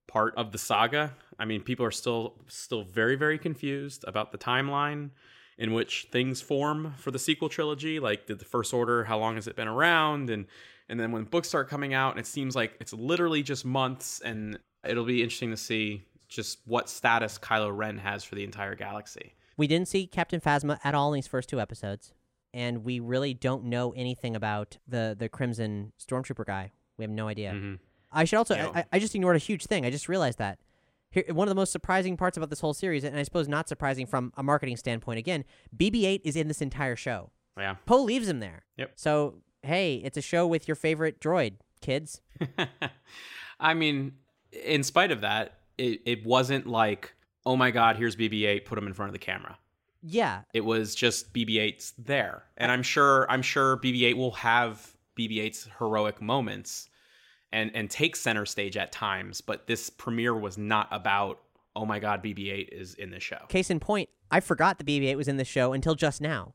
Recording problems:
none

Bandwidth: 16 kHz